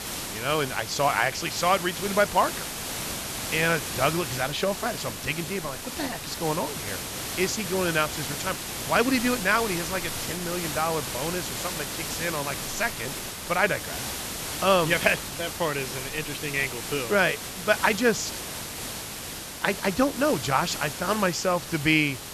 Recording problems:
high frequencies cut off; noticeable; nothing above 8 kHz
hiss; loud; throughout; 6 dB below the speech

